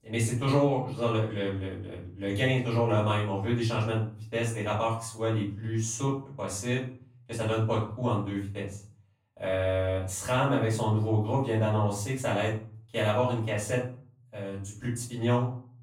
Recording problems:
off-mic speech; far
room echo; noticeable; dies away in 0.4 s

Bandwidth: 16 kHz